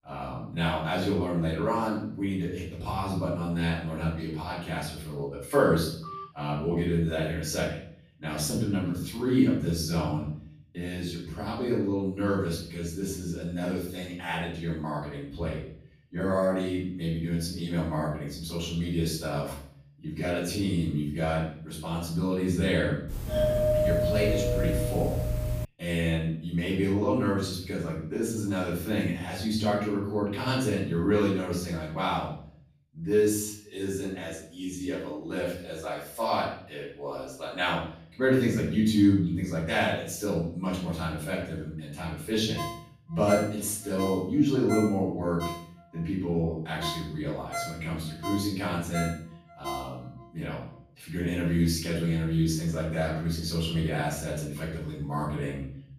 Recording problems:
off-mic speech; far
room echo; noticeable; dies away in 0.6 s
phone ringing; faint; at 6 s; peak 10 dB below the speech
doorbell; loud; from 23 to 26 s; peak 5 dB above the speech
phone ringing; noticeable; from 43 to 50 s; peak 6 dB below the speech

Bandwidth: 15 kHz